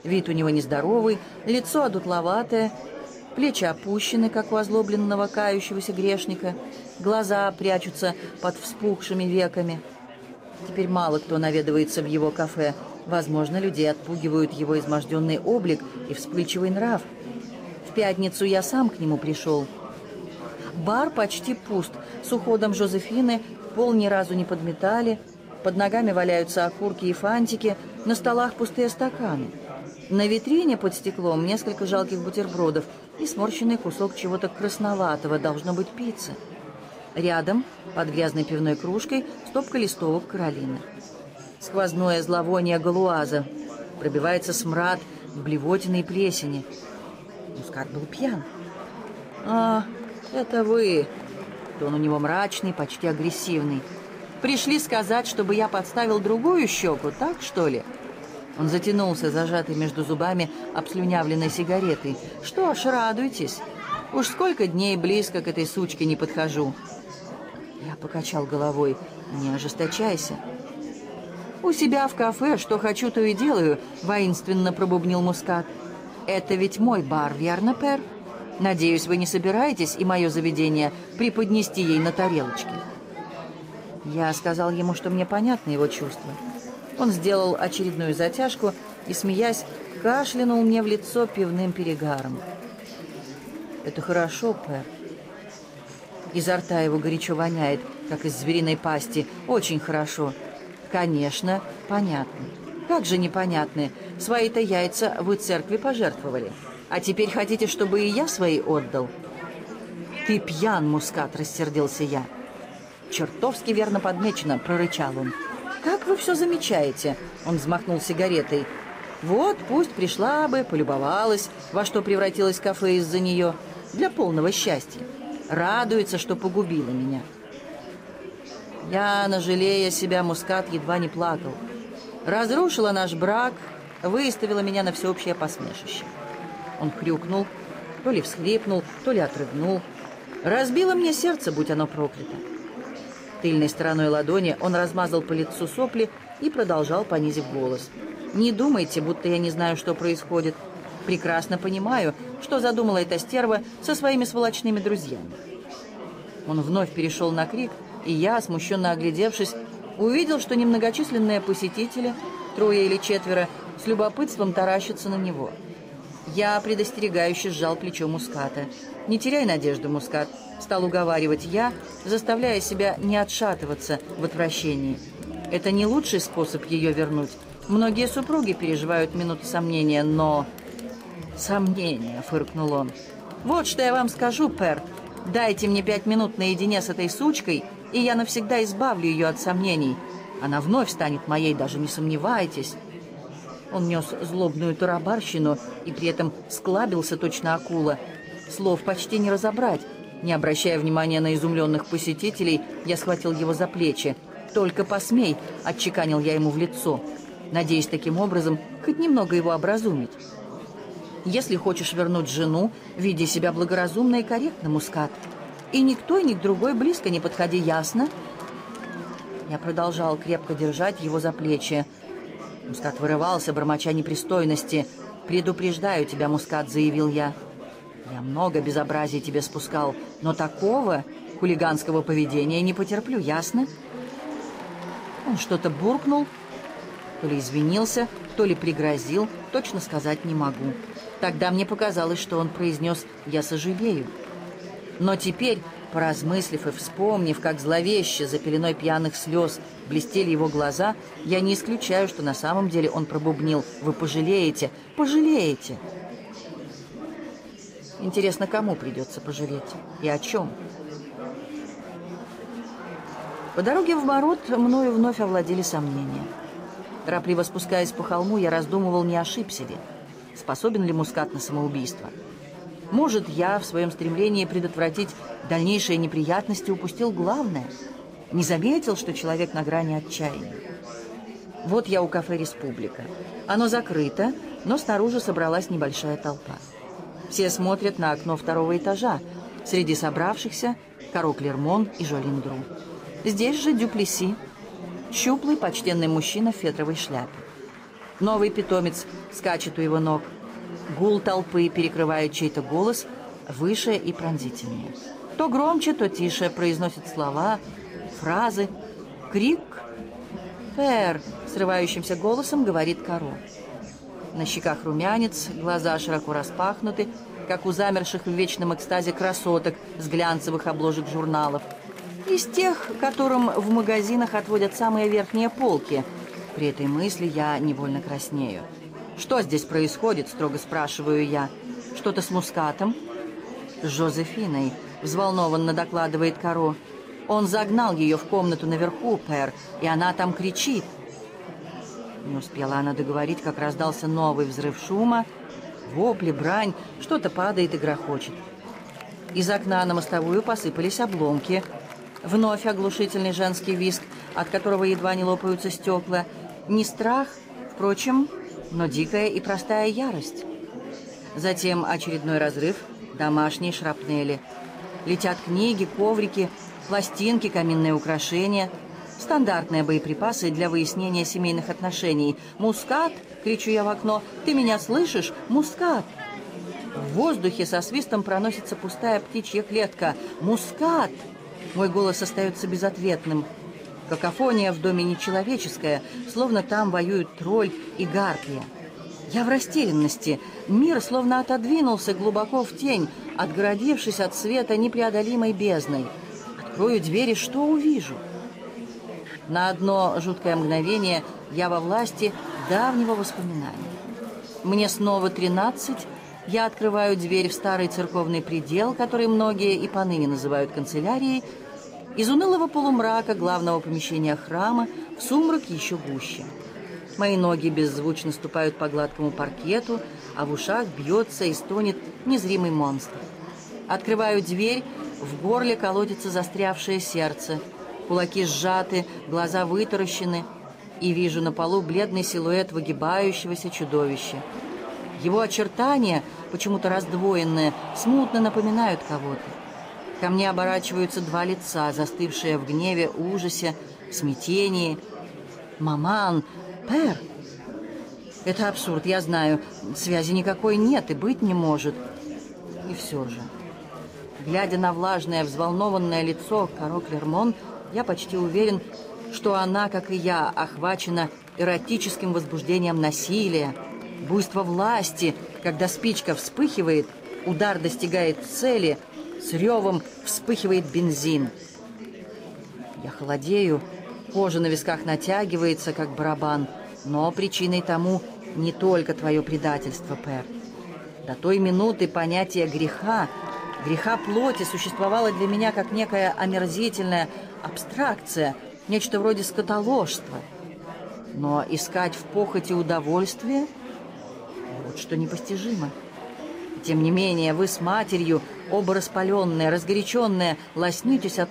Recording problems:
chatter from many people; noticeable; throughout; 15 dB below the speech

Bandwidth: 15.5 kHz